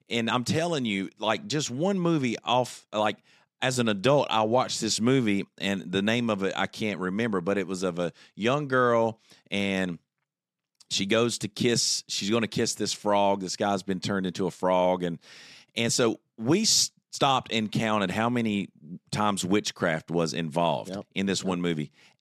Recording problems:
none

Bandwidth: 13.5 kHz